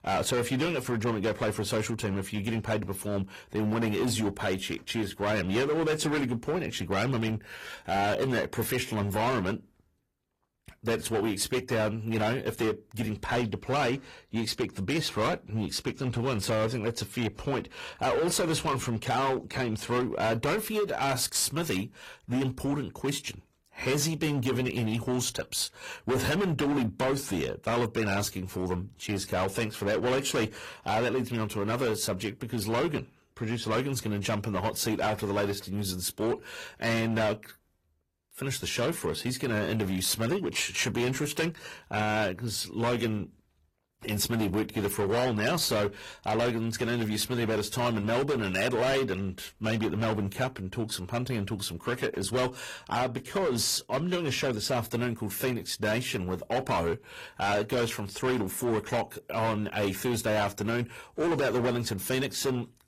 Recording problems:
distortion; heavy; 13% of the sound clipped
garbled, watery; slightly; nothing above 14.5 kHz

